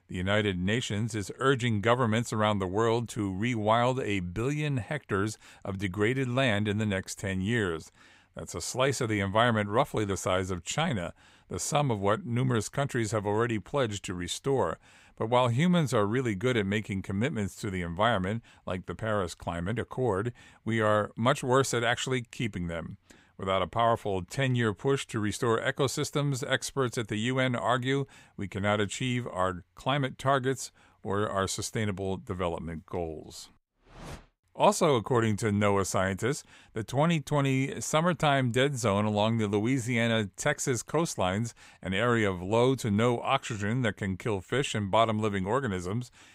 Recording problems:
none

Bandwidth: 15.5 kHz